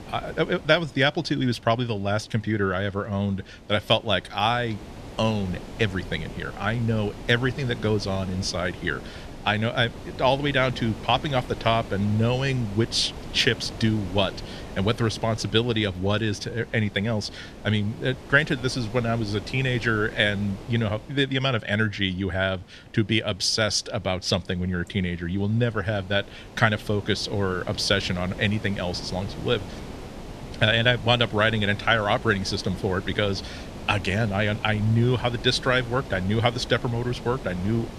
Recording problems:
wind noise on the microphone; occasional gusts; 15 dB below the speech

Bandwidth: 14 kHz